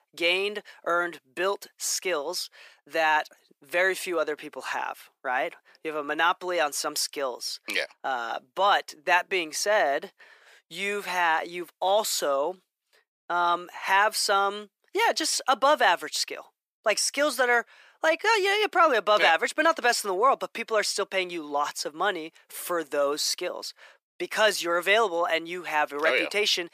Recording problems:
thin; very; fading below 450 Hz

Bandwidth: 15 kHz